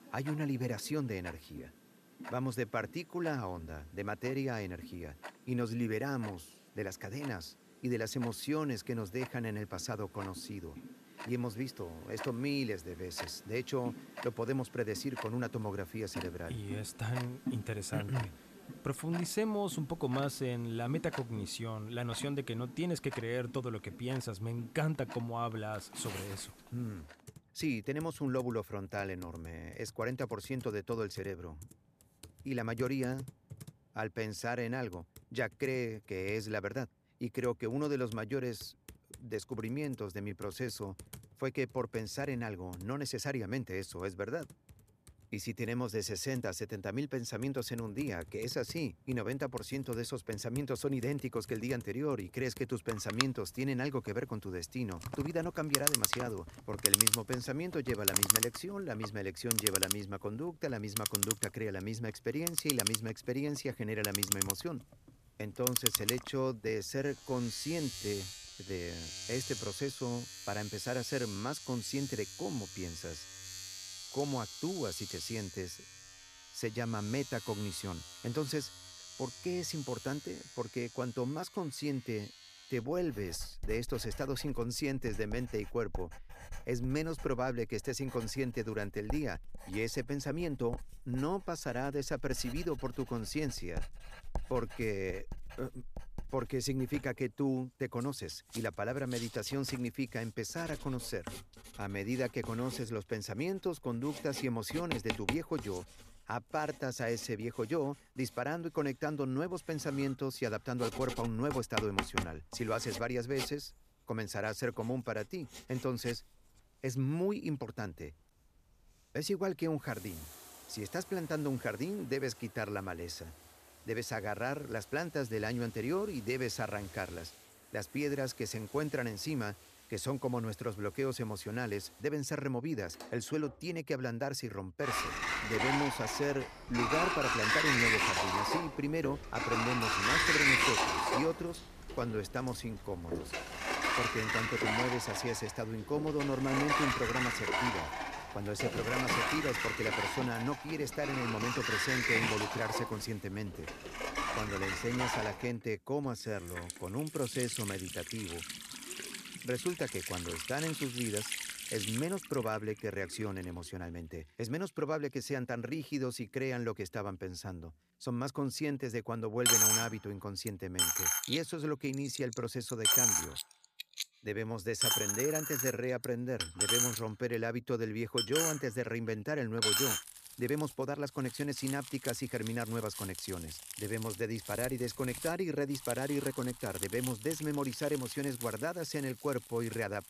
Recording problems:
household noises; very loud; throughout; 2 dB above the speech

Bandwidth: 14.5 kHz